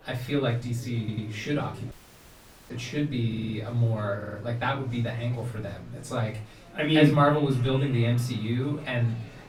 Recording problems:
off-mic speech; far
echo of what is said; faint; from 7 s on; 370 ms later, 20 dB below the speech
room echo; slight; dies away in 0.4 s
murmuring crowd; faint; throughout; 20 dB below the speech
audio stuttering; at 1 s, at 3.5 s and at 4 s
audio cutting out; at 2 s for 1 s

